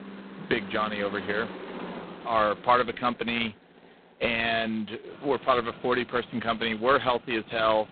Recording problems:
phone-call audio; poor line; nothing above 4 kHz
traffic noise; noticeable; throughout; 15 dB below the speech

